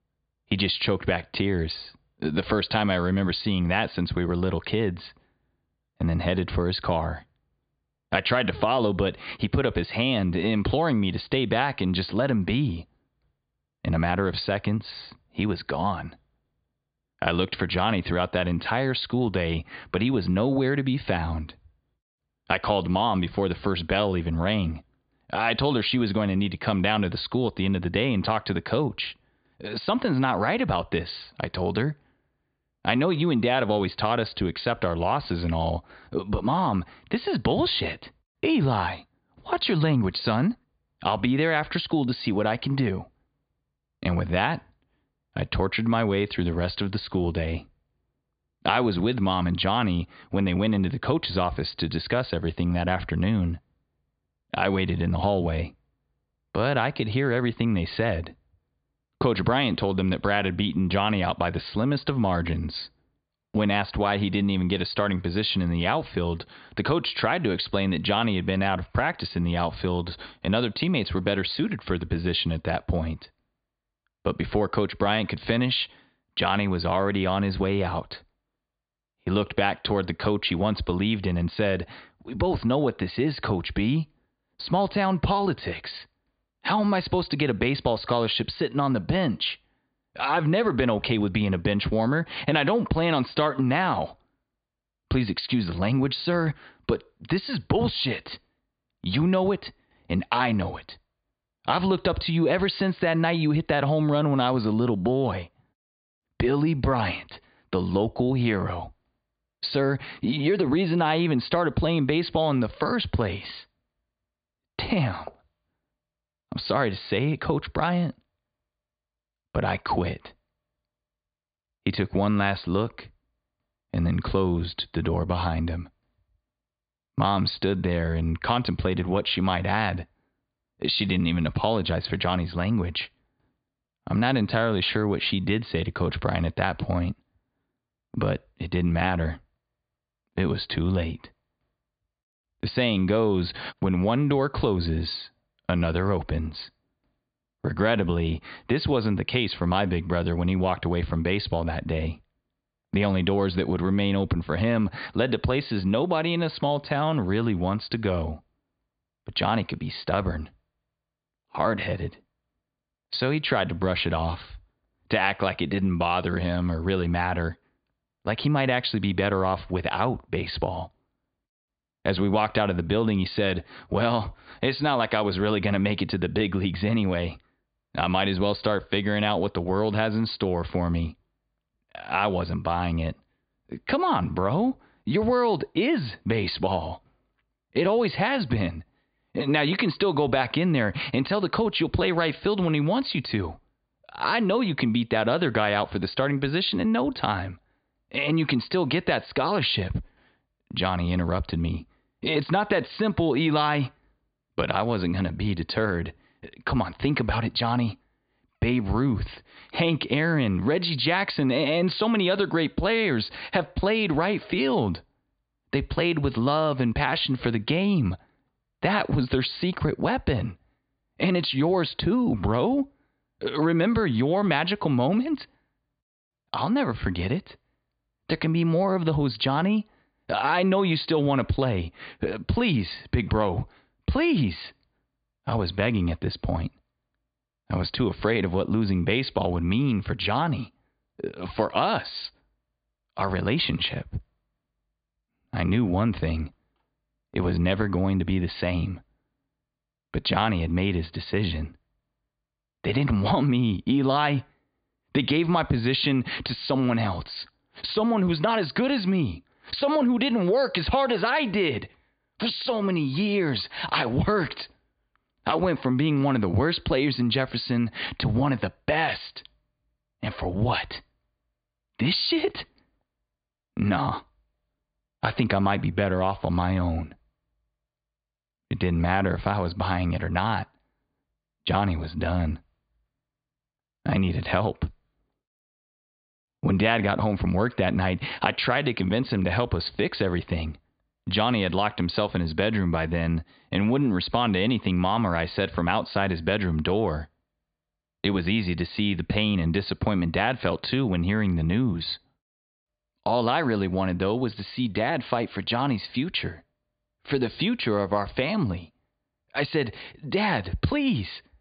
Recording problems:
high frequencies cut off; severe; nothing above 5 kHz

